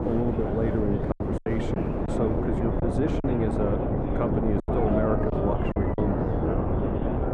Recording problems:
muffled; very; fading above 2.5 kHz
wind noise on the microphone; heavy; as loud as the speech
animal sounds; loud; throughout; 8 dB below the speech
murmuring crowd; loud; throughout; 5 dB below the speech
choppy; very; at 1 s, at 3 s and from 4.5 to 6 s; 11% of the speech affected

